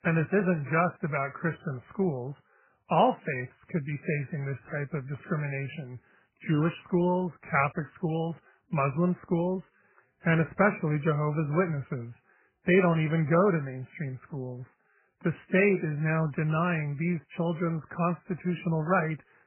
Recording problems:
garbled, watery; badly; nothing above 2.5 kHz

